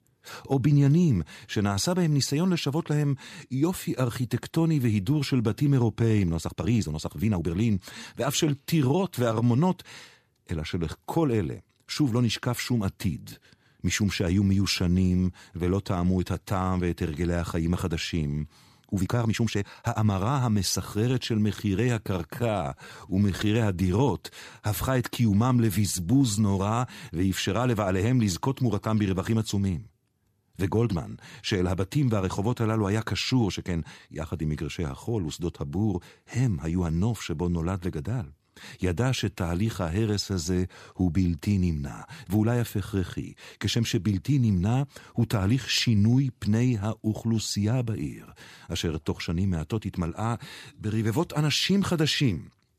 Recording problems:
uneven, jittery; strongly; from 6.5 to 23 s

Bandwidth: 14.5 kHz